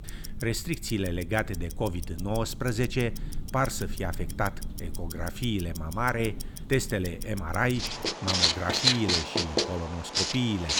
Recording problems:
household noises; very loud; throughout; as loud as the speech

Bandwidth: 18.5 kHz